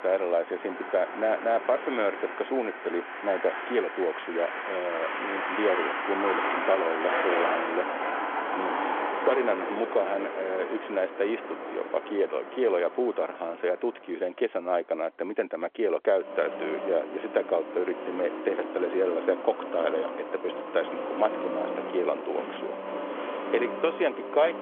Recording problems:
phone-call audio; nothing above 3.5 kHz
traffic noise; loud; throughout; 4 dB below the speech

